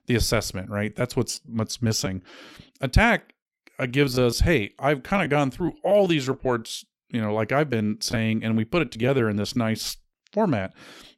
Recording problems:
choppy; very; 7% of the speech affected

